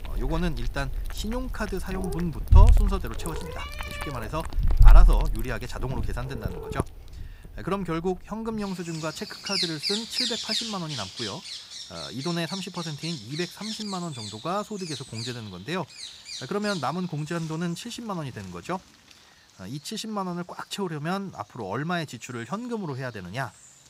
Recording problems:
animal sounds; very loud; throughout; 4 dB above the speech

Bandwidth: 15.5 kHz